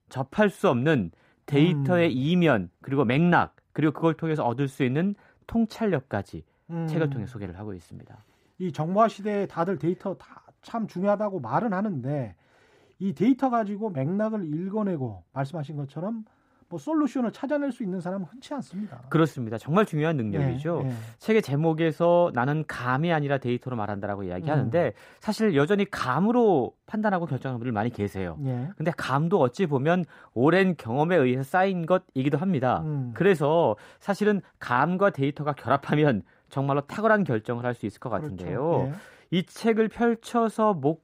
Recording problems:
muffled; slightly; fading above 2.5 kHz

